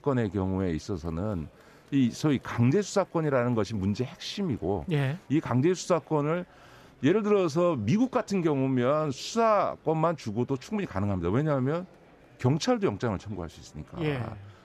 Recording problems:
murmuring crowd; faint; throughout; 30 dB below the speech

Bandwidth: 14.5 kHz